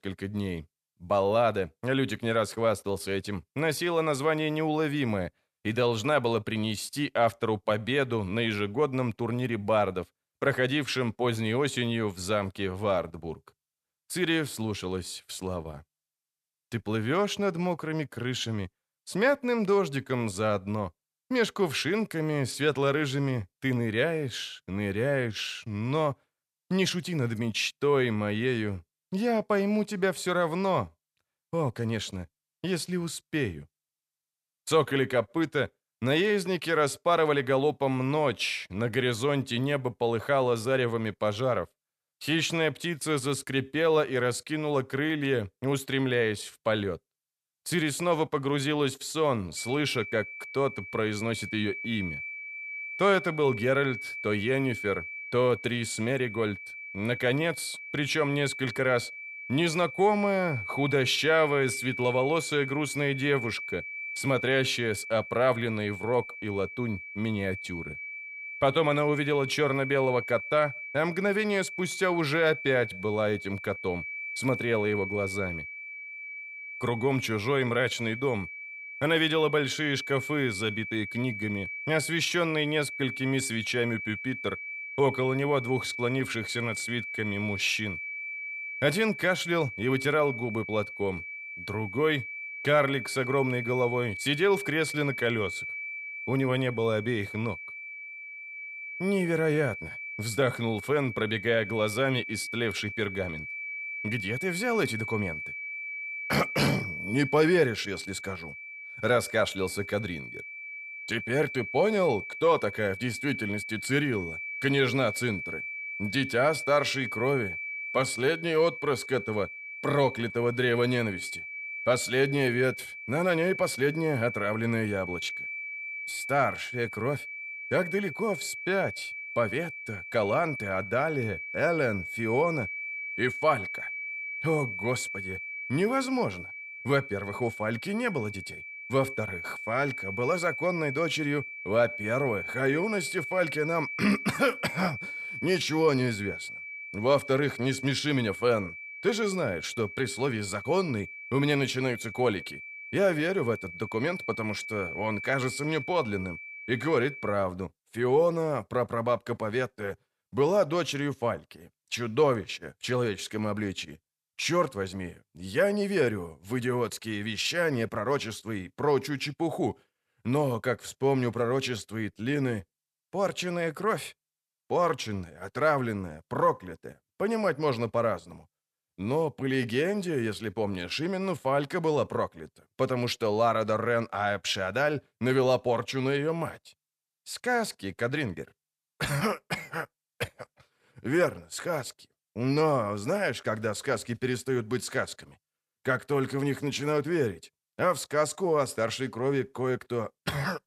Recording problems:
high-pitched whine; loud; from 50 s to 2:37; 2.5 kHz, 8 dB below the speech

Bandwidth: 14 kHz